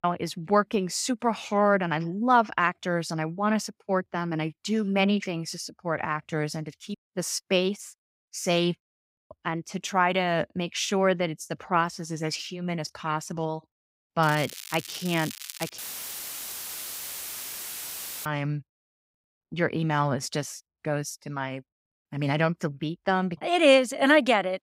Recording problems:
crackling; noticeable; from 14 to 16 s; 10 dB below the speech
audio cutting out; filled with static; at 16 s for 2.5 s

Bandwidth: 15.5 kHz